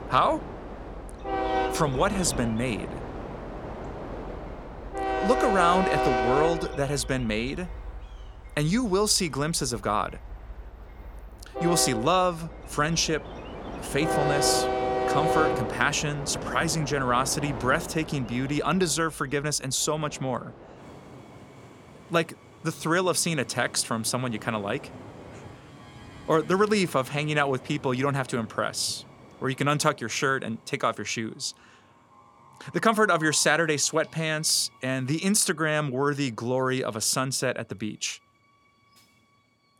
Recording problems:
train or aircraft noise; loud; throughout; 6 dB below the speech

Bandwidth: 17.5 kHz